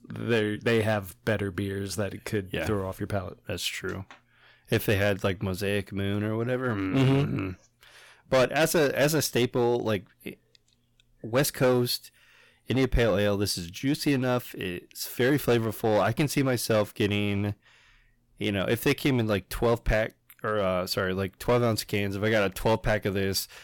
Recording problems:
distortion; slight; 5% of the sound clipped

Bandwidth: 17.5 kHz